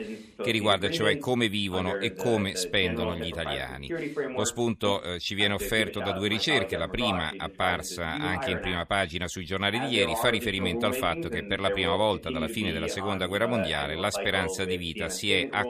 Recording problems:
voice in the background; loud; throughout; 7 dB below the speech

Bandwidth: 14.5 kHz